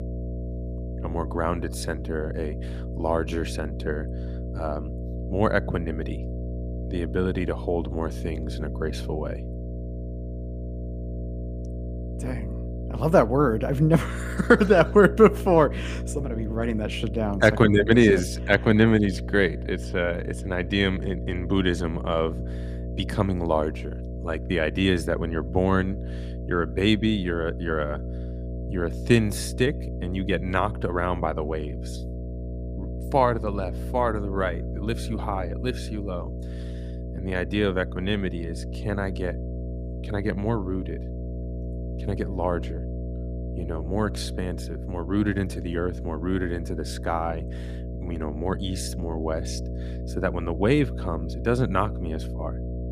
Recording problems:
electrical hum; noticeable; throughout; 60 Hz, 15 dB below the speech

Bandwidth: 15 kHz